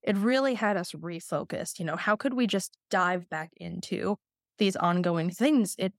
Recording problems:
none

